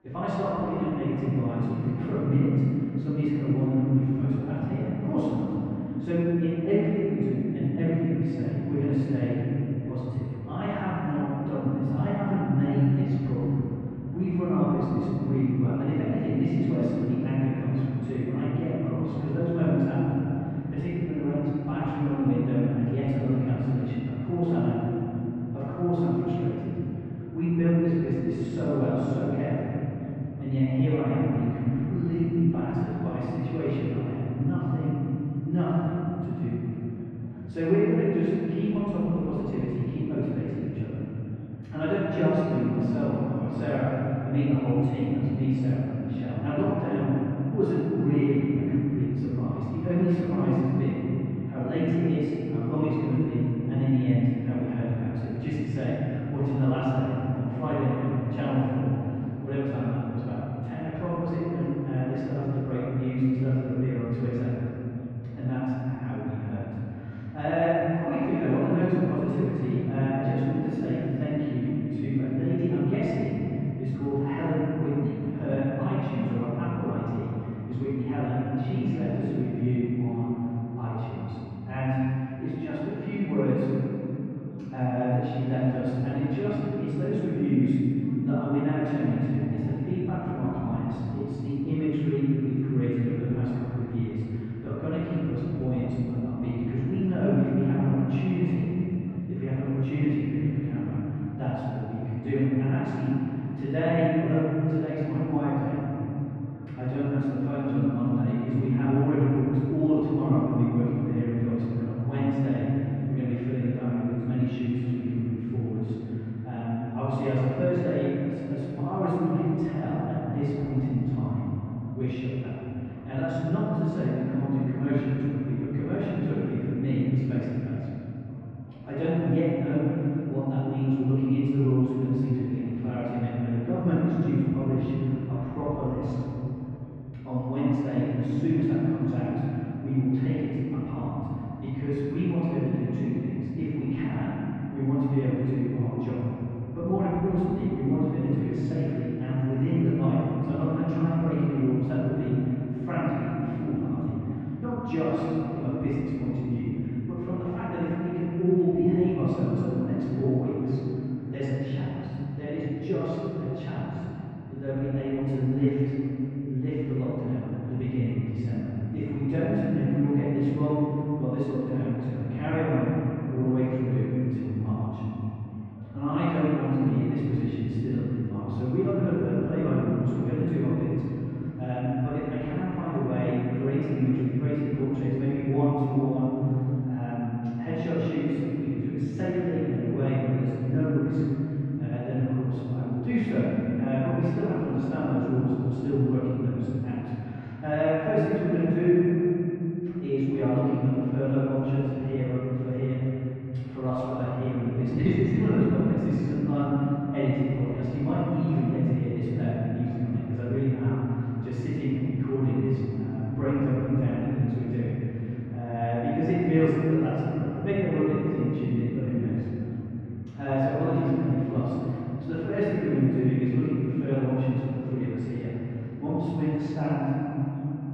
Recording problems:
room echo; strong; dies away in 3 s
off-mic speech; far
muffled; very; fading above 1.5 kHz
chatter from many people; faint; throughout; 30 dB below the speech

